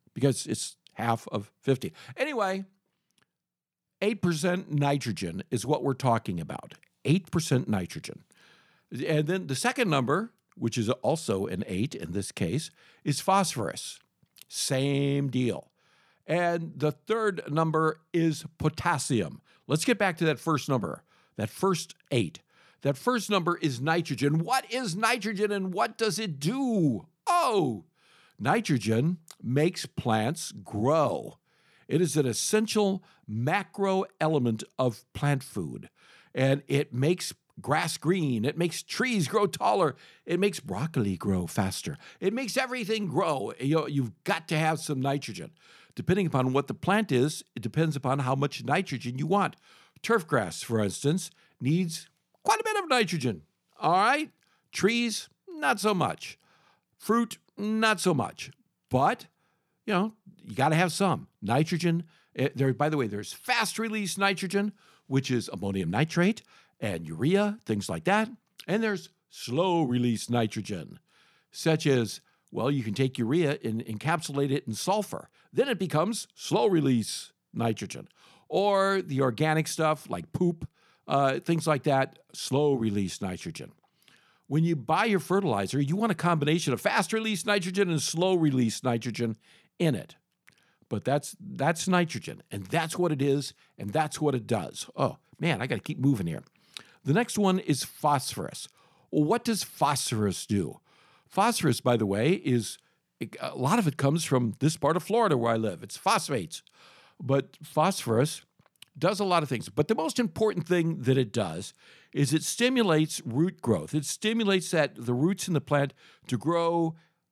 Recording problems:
none

